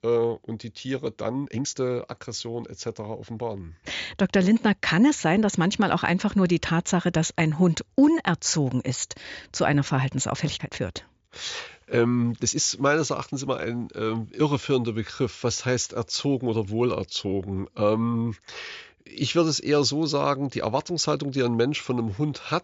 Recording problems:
high frequencies cut off; noticeable; nothing above 7.5 kHz
uneven, jittery; strongly; from 1.5 to 13 s

